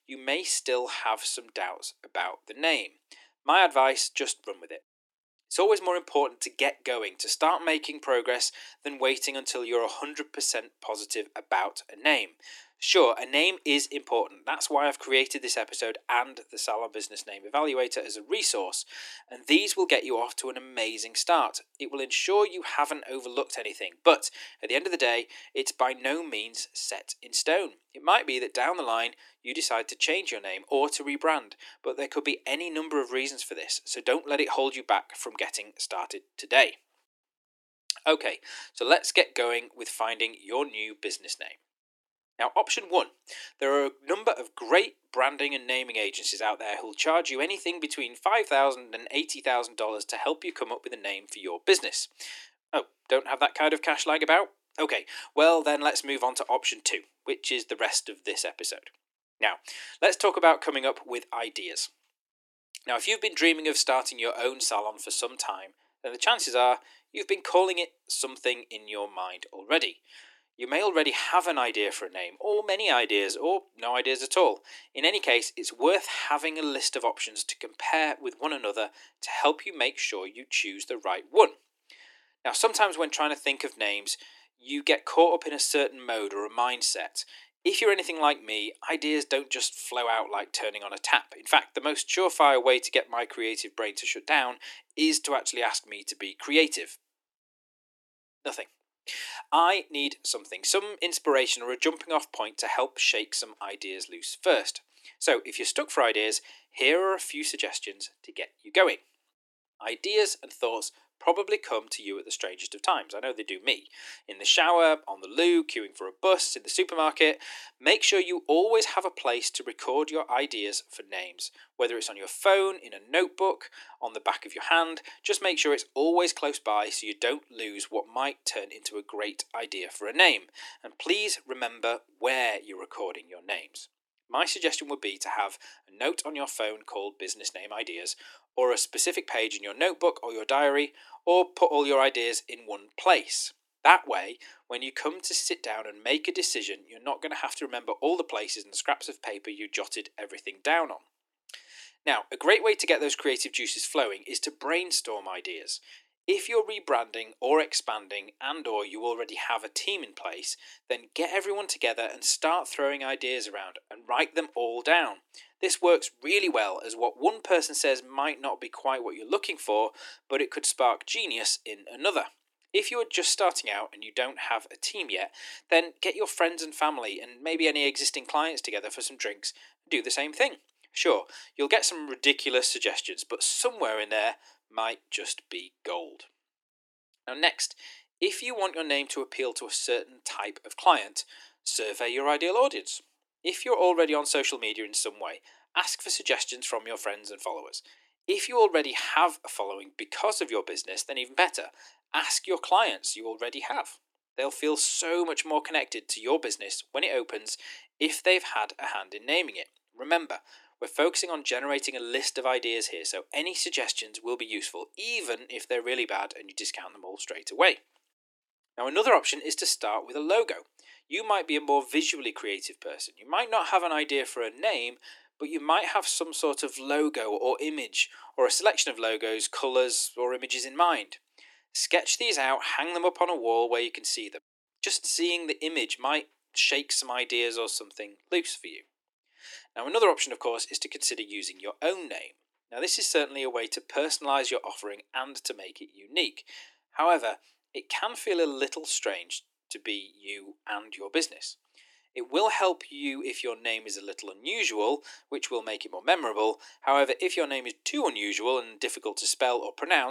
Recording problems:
thin; very; fading below 300 Hz
abrupt cut into speech; at the end

